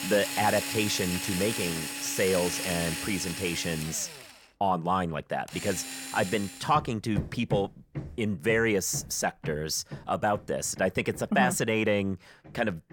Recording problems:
machinery noise; loud; throughout; 6 dB below the speech

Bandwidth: 17.5 kHz